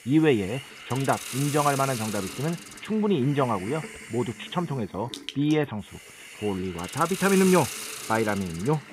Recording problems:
high frequencies cut off; severe; nothing above 4 kHz
hiss; loud; throughout; 10 dB below the speech

